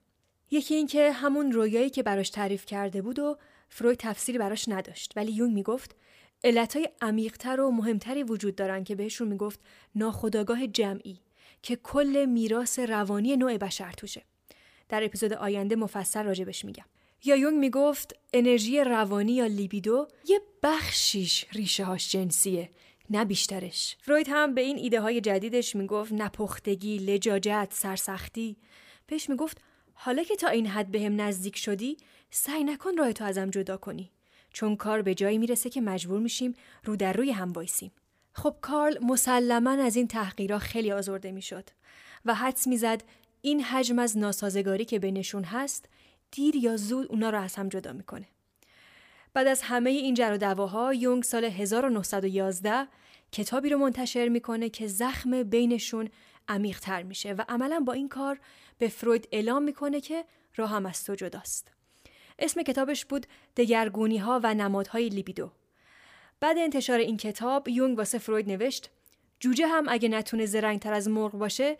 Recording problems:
none

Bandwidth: 15 kHz